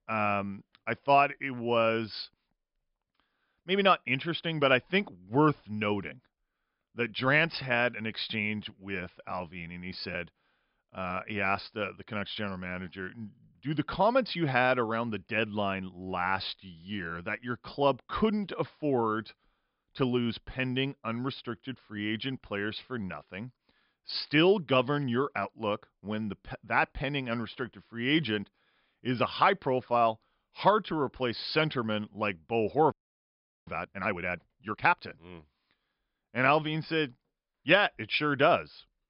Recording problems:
high frequencies cut off; noticeable; nothing above 5.5 kHz
audio freezing; at 33 s for 1 s

